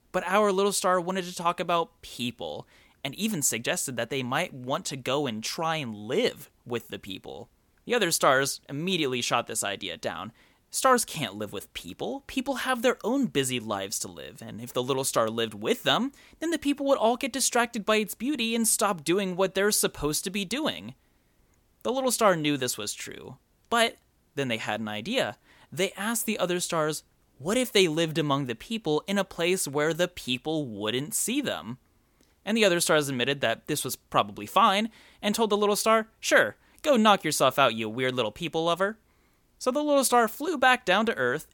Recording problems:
none

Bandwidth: 17.5 kHz